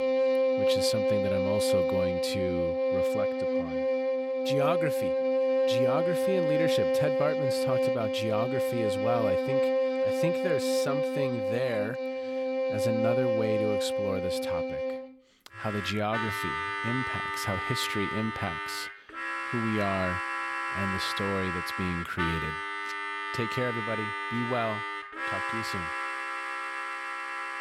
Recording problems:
background music; very loud; throughout; 4 dB above the speech

